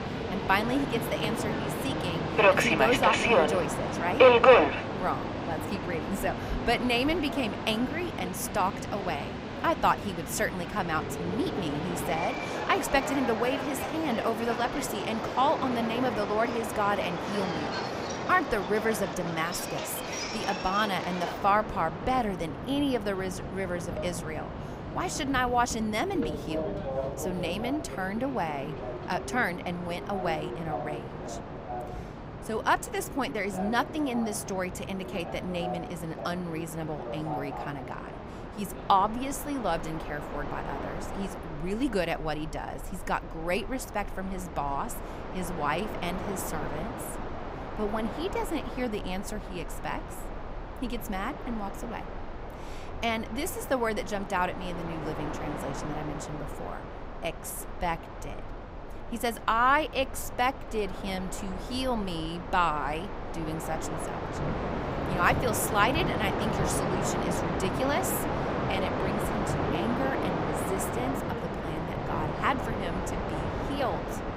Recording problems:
train or aircraft noise; loud; throughout; 1 dB below the speech

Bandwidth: 15.5 kHz